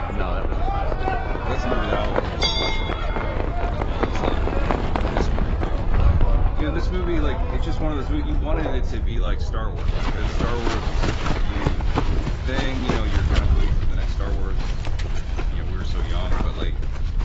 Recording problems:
garbled, watery; badly; nothing above 7.5 kHz
animal sounds; very loud; throughout; 5 dB above the speech
wind noise on the microphone; occasional gusts; 10 dB below the speech
uneven, jittery; strongly; from 0.5 to 16 s

